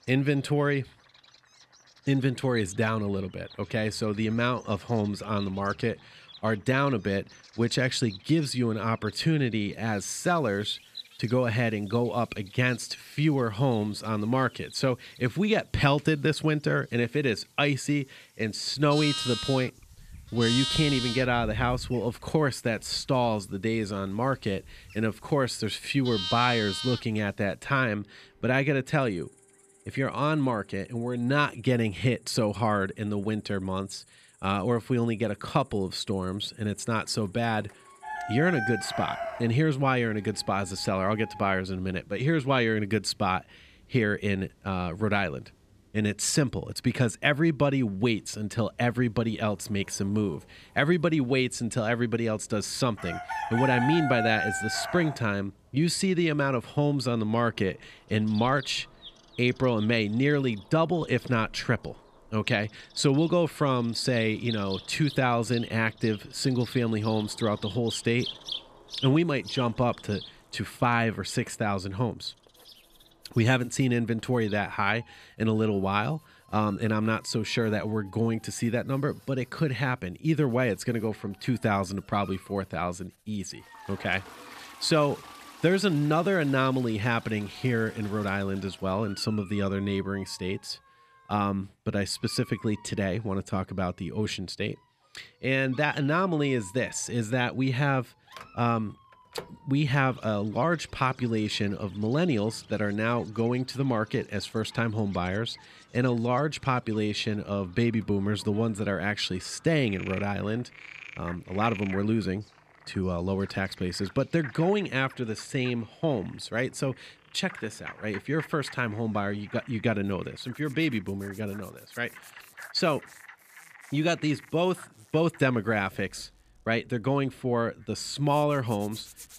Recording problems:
animal sounds; noticeable; throughout; 10 dB below the speech
household noises; faint; throughout; 30 dB below the speech

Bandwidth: 14.5 kHz